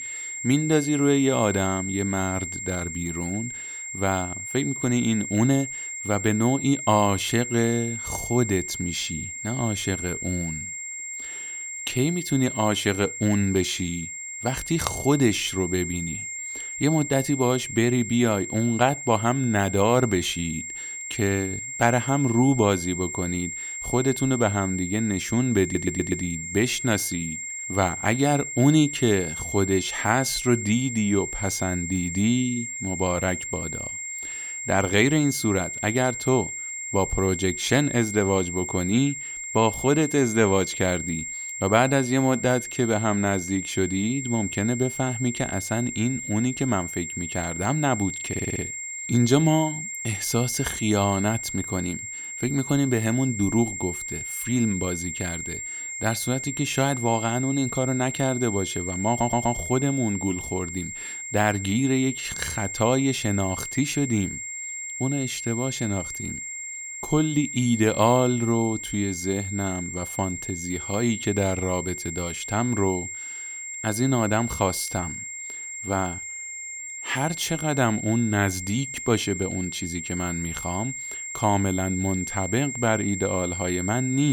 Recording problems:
high-pitched whine; loud; throughout; 7.5 kHz, 6 dB below the speech
audio stuttering; at 26 s, at 48 s and at 59 s
abrupt cut into speech; at the end

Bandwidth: 18 kHz